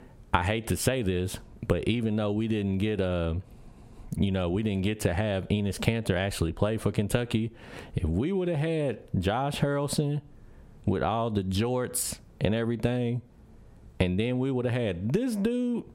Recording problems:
squashed, flat; somewhat

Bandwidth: 16 kHz